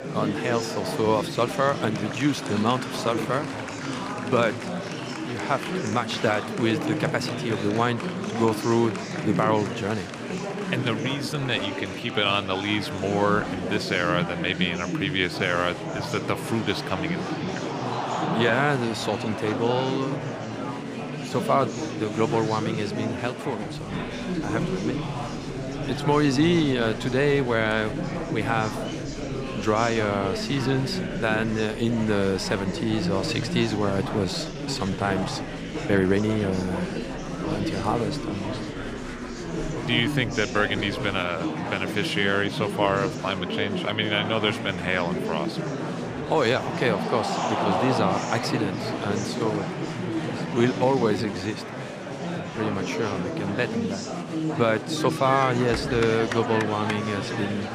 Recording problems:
murmuring crowd; loud; throughout; 4 dB below the speech
uneven, jittery; strongly; from 34 to 51 s

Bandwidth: 15 kHz